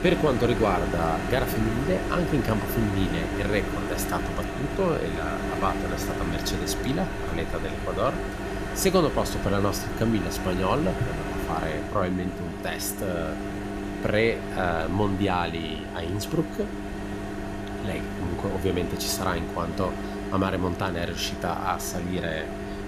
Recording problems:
household noises; loud; throughout; 4 dB below the speech

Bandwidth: 14.5 kHz